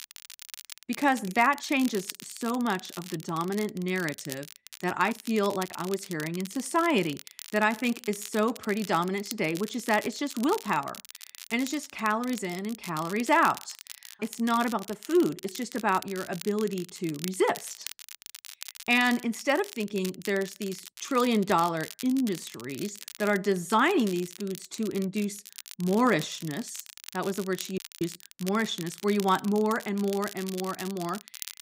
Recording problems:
crackle, like an old record; noticeable; 15 dB below the speech
audio cutting out; at 28 s

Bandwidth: 15.5 kHz